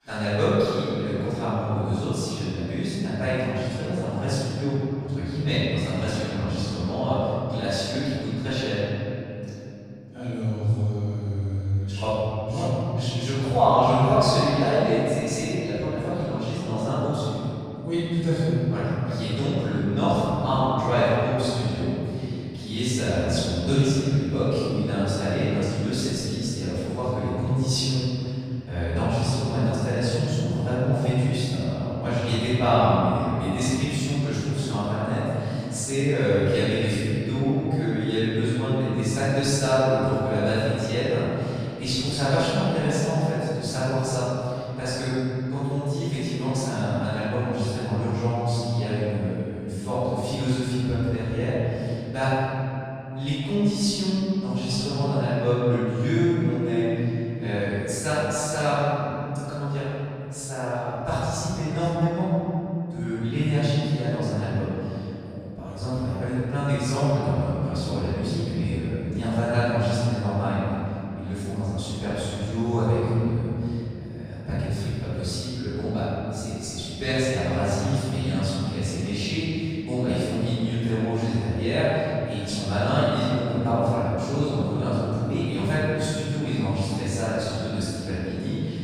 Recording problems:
room echo; strong; dies away in 3 s
off-mic speech; far

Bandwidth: 15 kHz